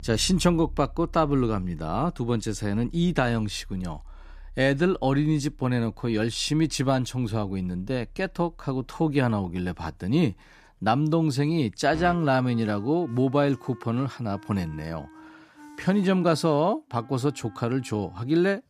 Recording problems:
background music; faint; throughout; 20 dB below the speech

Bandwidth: 14.5 kHz